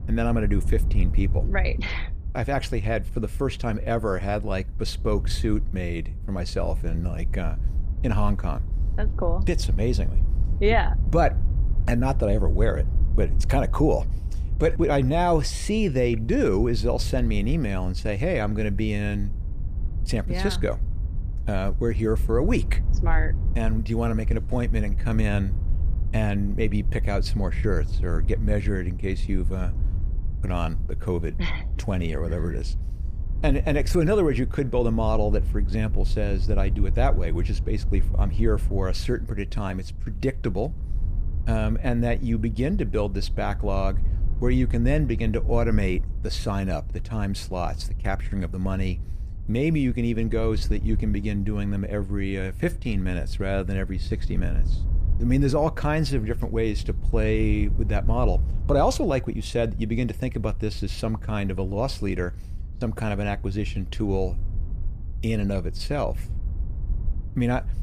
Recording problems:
wind noise on the microphone; occasional gusts; 20 dB below the speech

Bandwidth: 15 kHz